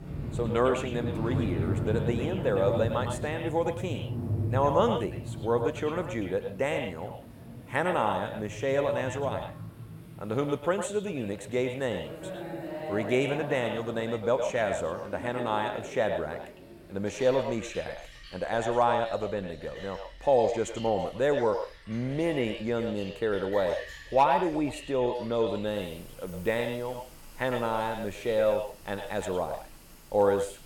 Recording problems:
echo of what is said; strong; throughout; 110 ms later, 6 dB below the speech
rain or running water; loud; throughout; 8 dB below the speech

